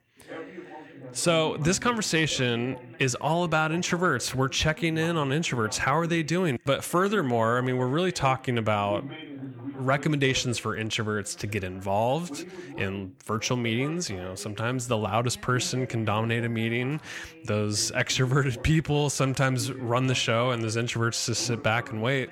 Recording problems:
background chatter; noticeable; throughout; 2 voices, 15 dB below the speech

